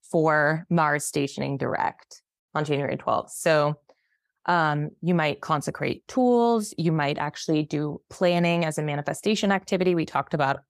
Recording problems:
none

